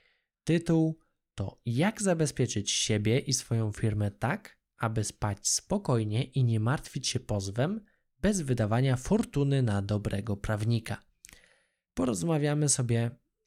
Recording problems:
none

